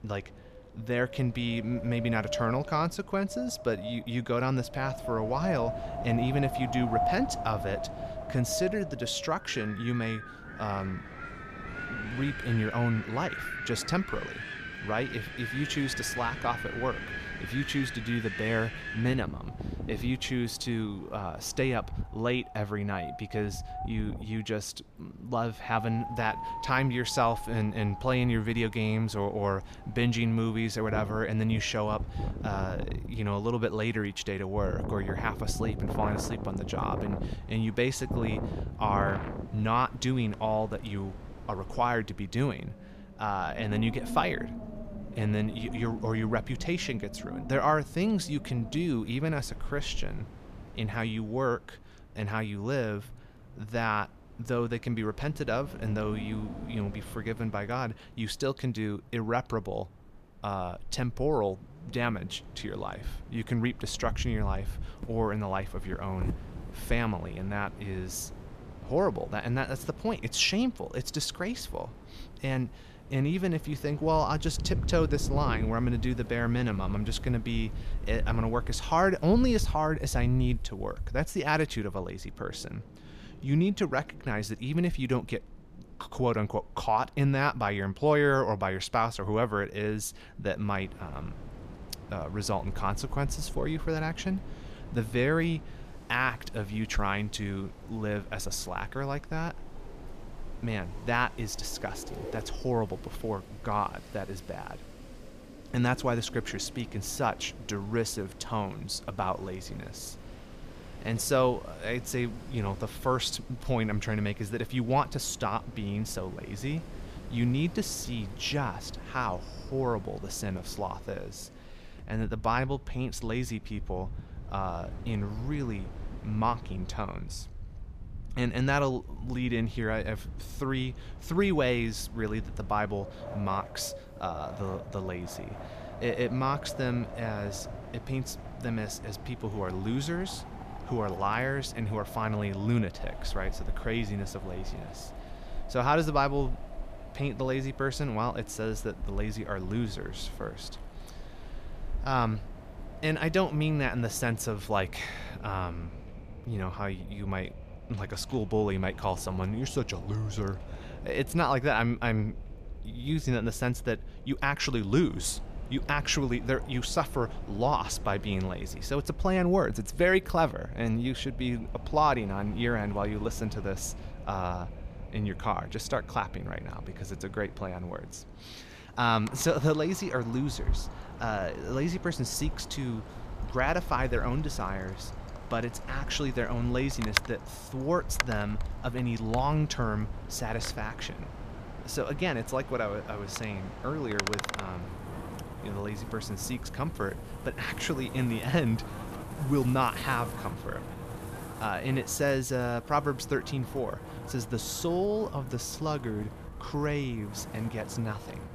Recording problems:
wind in the background; loud; throughout; 10 dB below the speech

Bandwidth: 14.5 kHz